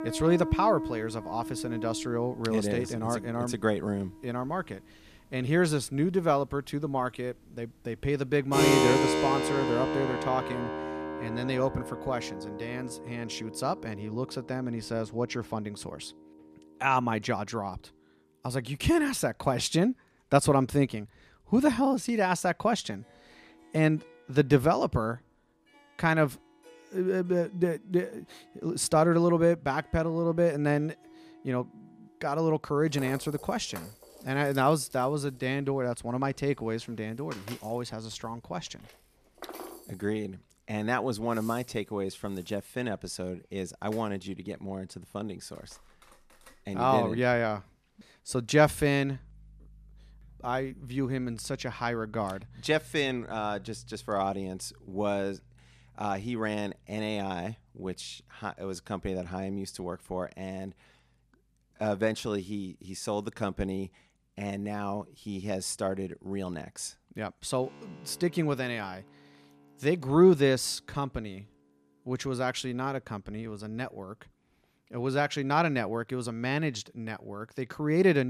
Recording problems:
background music; loud; throughout; 4 dB below the speech
abrupt cut into speech; at the end

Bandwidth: 14.5 kHz